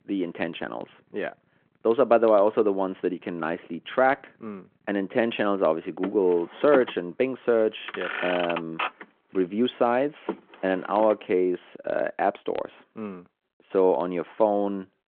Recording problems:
phone-call audio
traffic noise; loud; until 11 s; 9 dB below the speech

